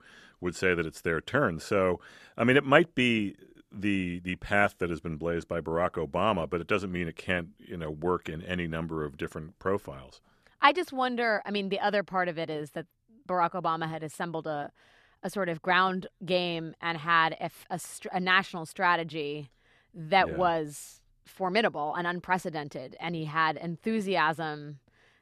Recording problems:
none

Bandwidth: 14 kHz